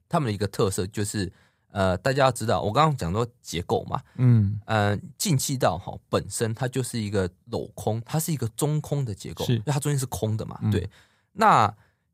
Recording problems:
none

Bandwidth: 15.5 kHz